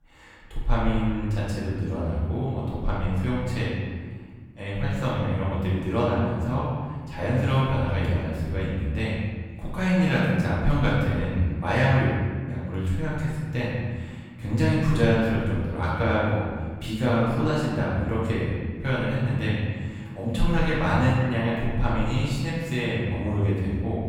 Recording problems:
room echo; strong; dies away in 1.6 s
off-mic speech; far

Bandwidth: 17.5 kHz